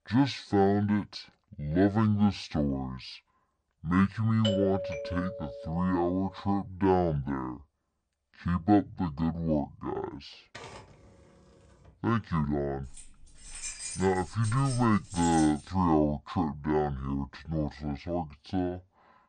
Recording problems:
wrong speed and pitch; too slow and too low; 0.6 times normal speed
doorbell; noticeable; from 4.5 to 6 s; peak 3 dB below the speech
keyboard typing; faint; from 10 to 12 s; peak 15 dB below the speech
jangling keys; noticeable; from 13 to 16 s; peak 7 dB below the speech

